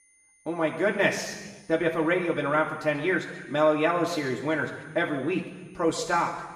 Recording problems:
off-mic speech; far
room echo; noticeable; dies away in 1.2 s
high-pitched whine; faint; throughout; 2 kHz, 35 dB below the speech

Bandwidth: 14.5 kHz